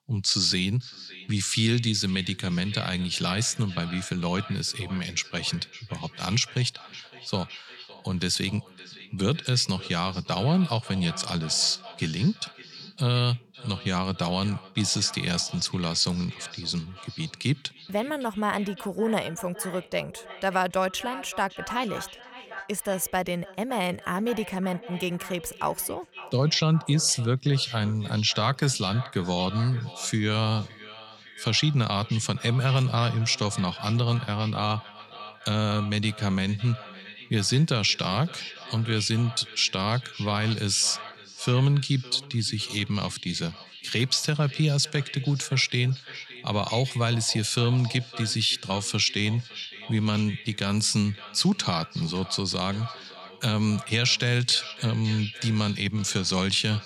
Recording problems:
echo of what is said; noticeable; throughout; 560 ms later, 15 dB below the speech

